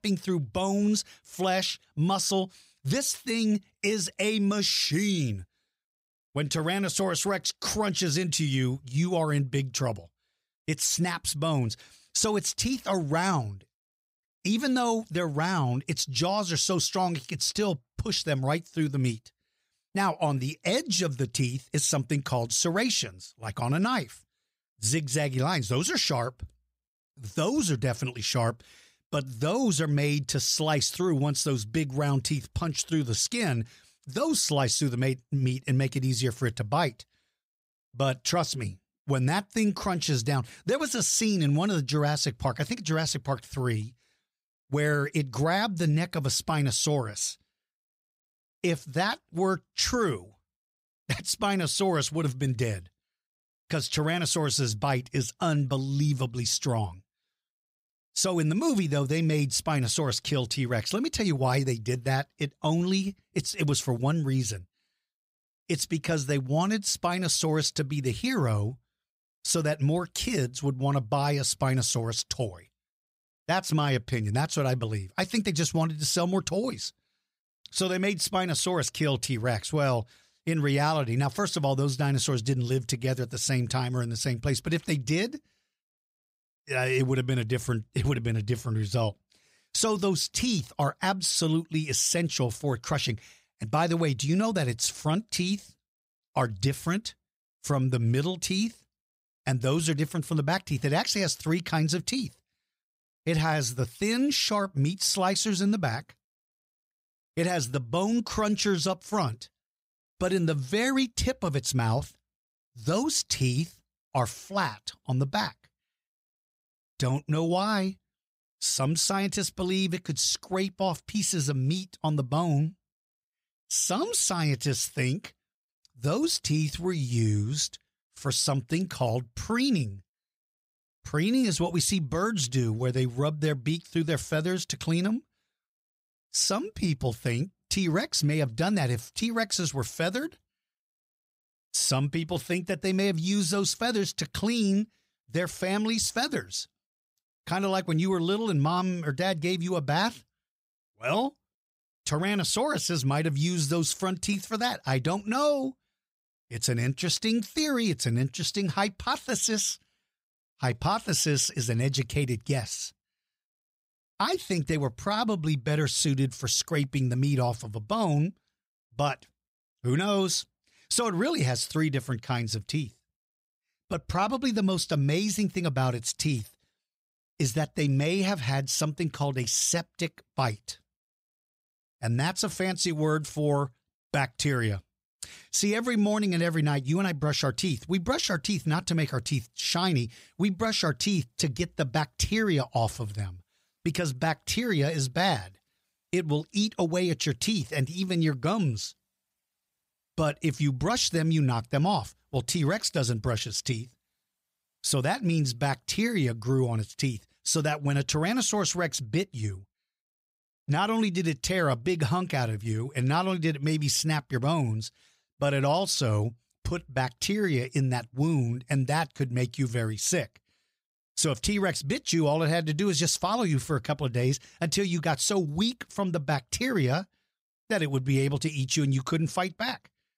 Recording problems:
none

